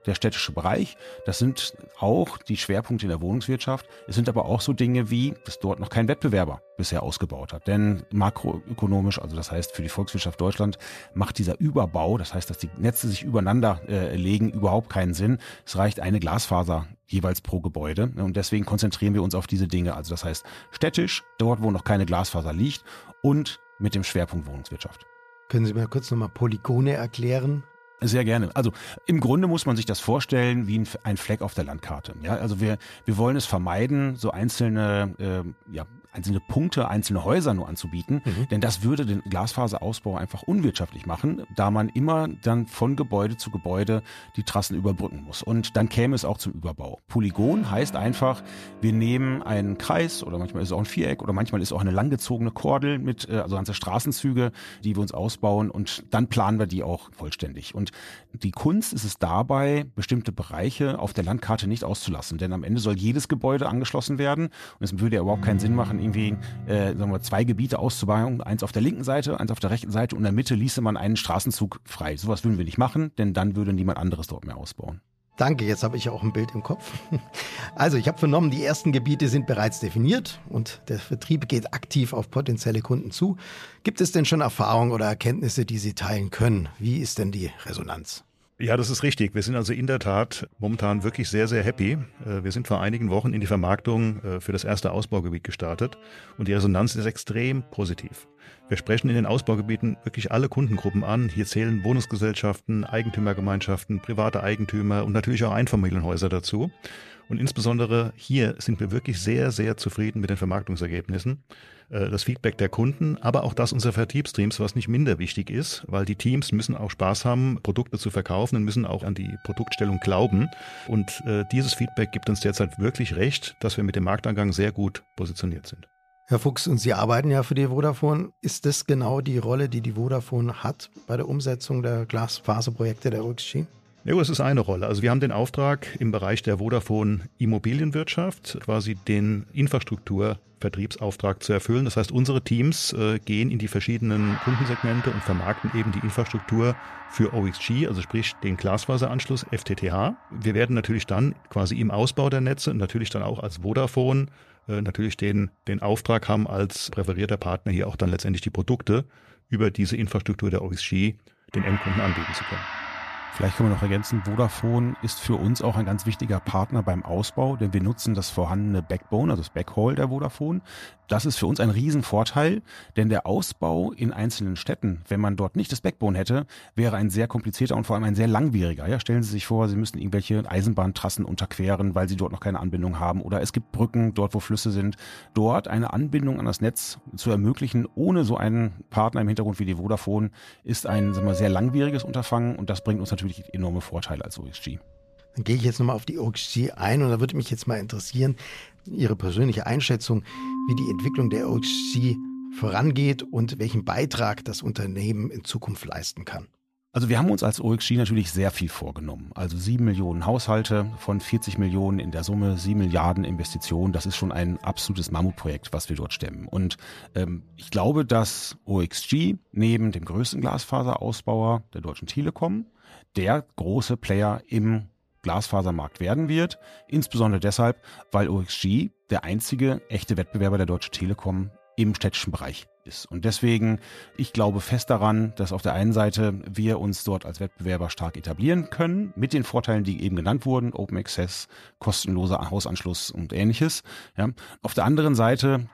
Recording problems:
background music; noticeable; throughout; 15 dB below the speech

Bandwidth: 14.5 kHz